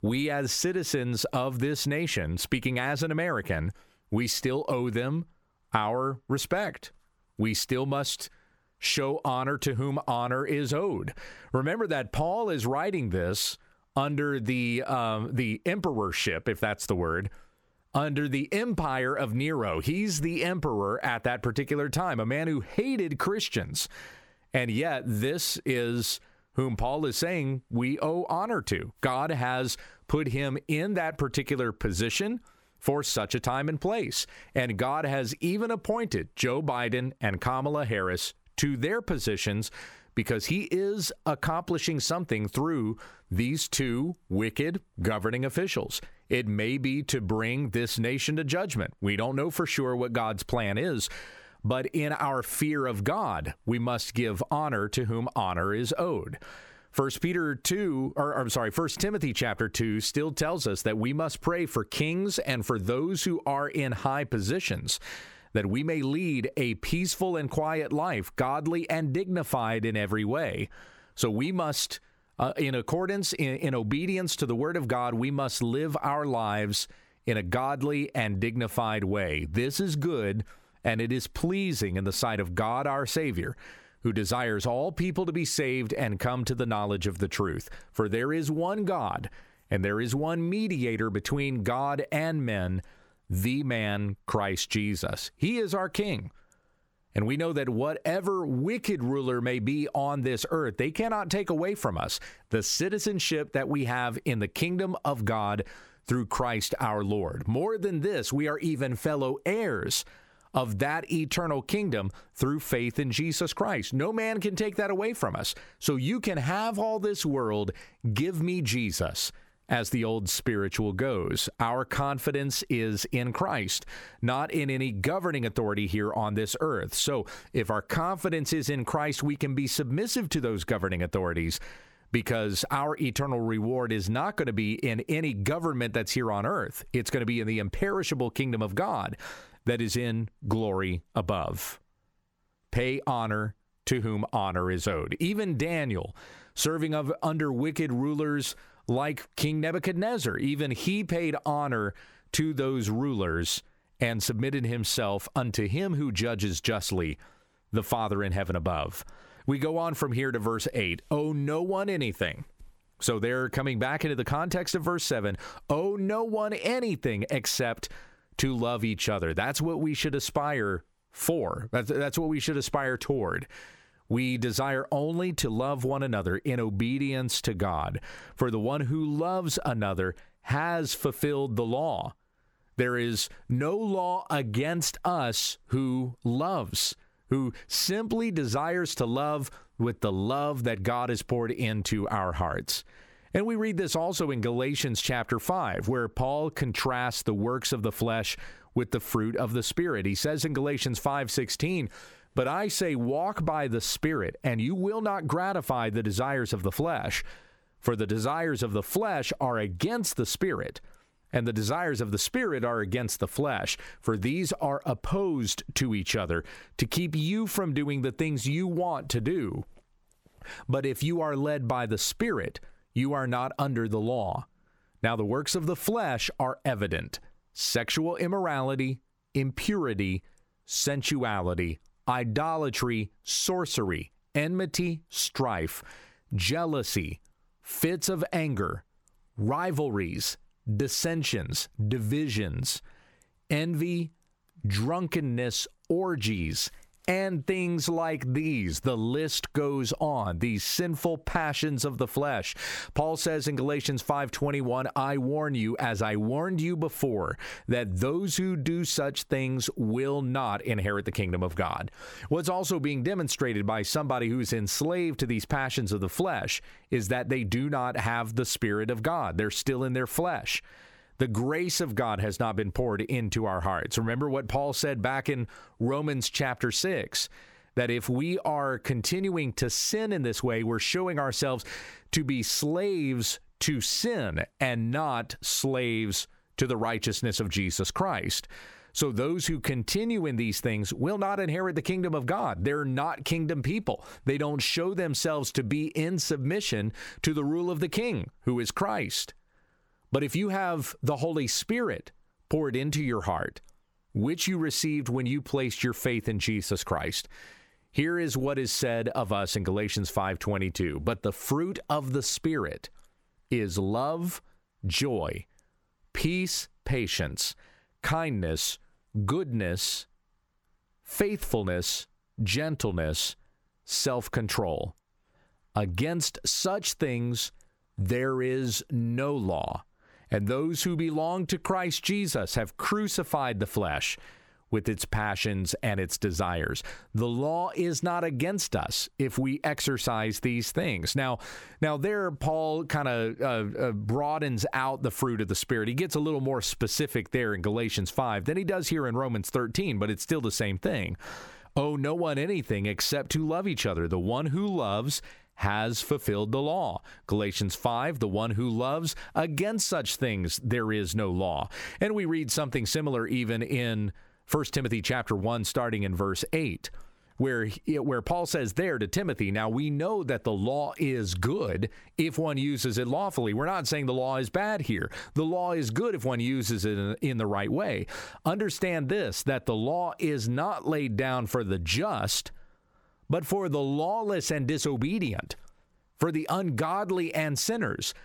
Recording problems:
squashed, flat; somewhat

